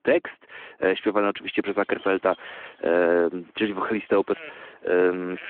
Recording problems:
phone-call audio
animal sounds; faint; from 1.5 s on; 25 dB below the speech

